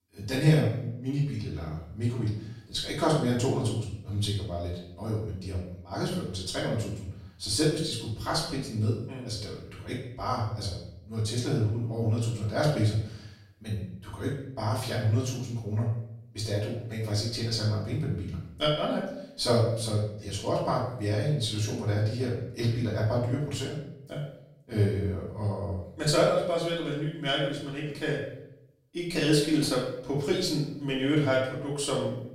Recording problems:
off-mic speech; far
room echo; noticeable; dies away in 0.6 s

